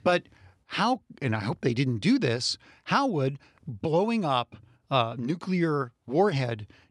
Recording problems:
none

